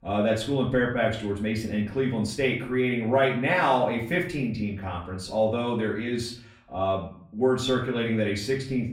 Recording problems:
off-mic speech; far
room echo; slight; dies away in 0.5 s

